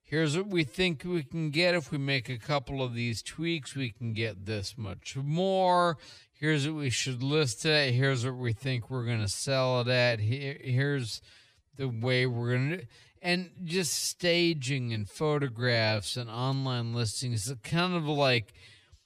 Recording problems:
wrong speed, natural pitch; too slow; 0.6 times normal speed

